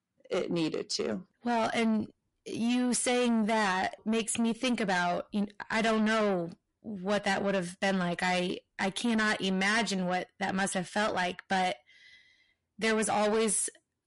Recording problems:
distortion; heavy; 7 dB below the speech
garbled, watery; slightly; nothing above 11 kHz

